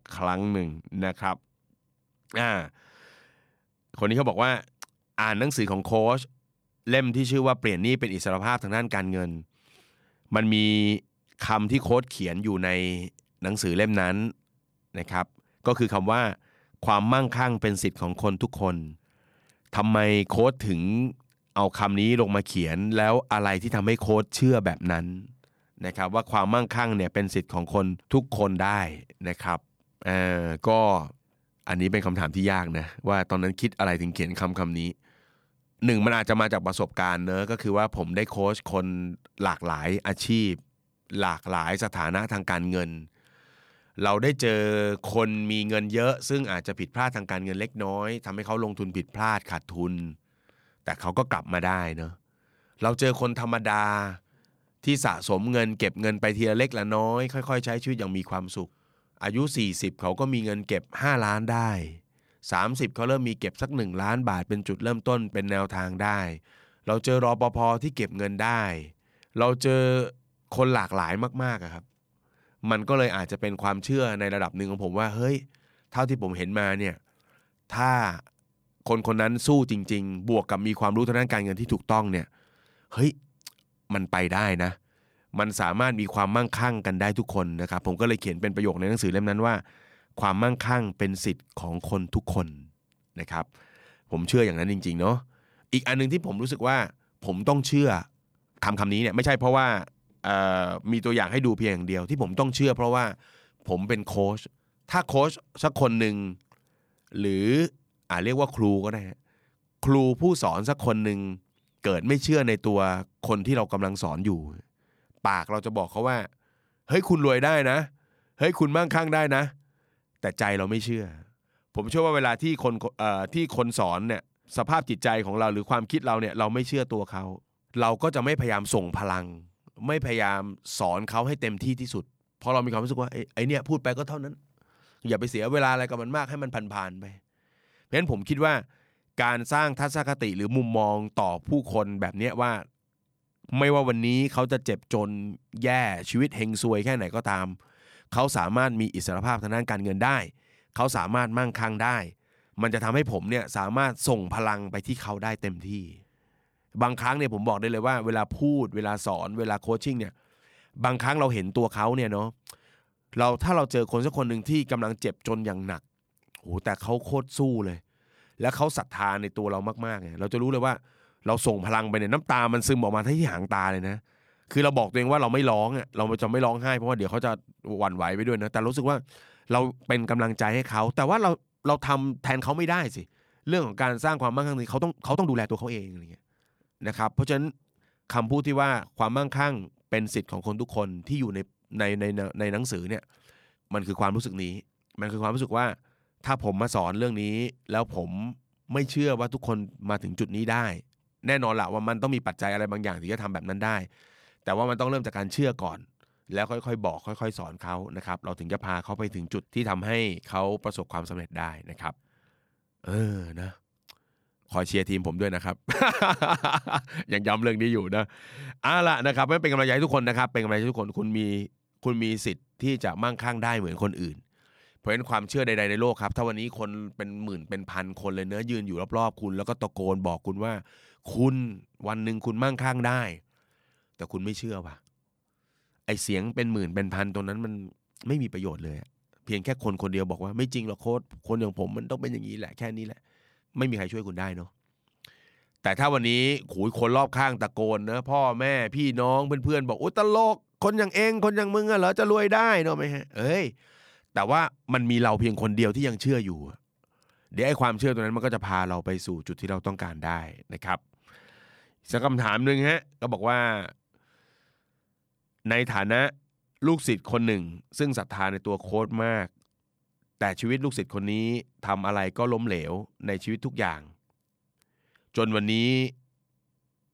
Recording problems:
uneven, jittery; strongly; from 1:38 to 4:29

